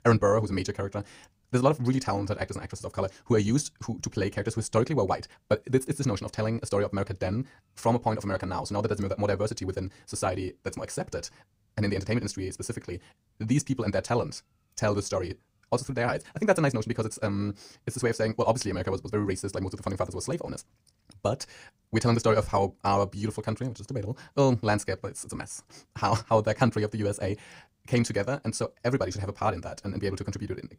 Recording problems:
wrong speed, natural pitch; too fast; 1.7 times normal speed

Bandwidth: 15.5 kHz